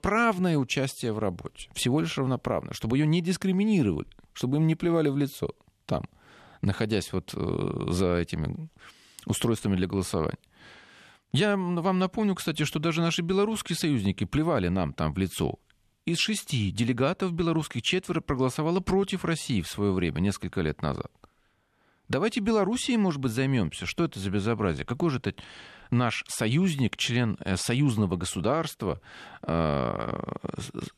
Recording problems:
none

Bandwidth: 13.5 kHz